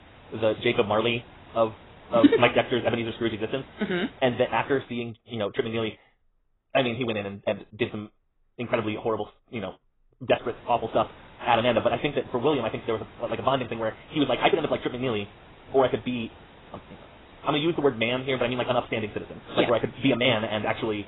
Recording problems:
garbled, watery; badly; nothing above 3.5 kHz
wrong speed, natural pitch; too fast; 1.8 times normal speed
hiss; faint; until 5 s and from 10 s on; 25 dB below the speech

